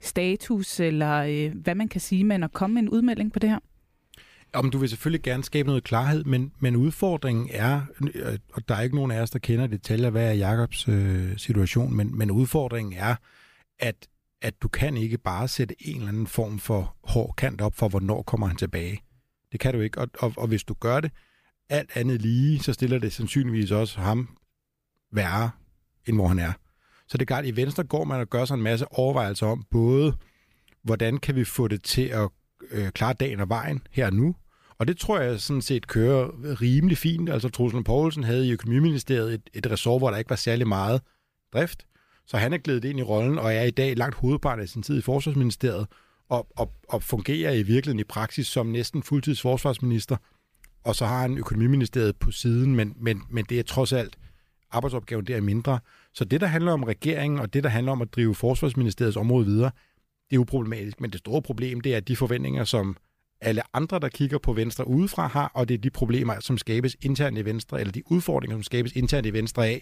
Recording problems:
none

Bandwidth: 15 kHz